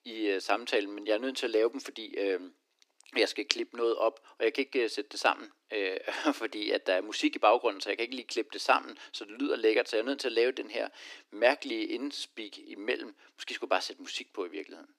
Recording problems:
thin; somewhat; fading below 300 Hz

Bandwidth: 15 kHz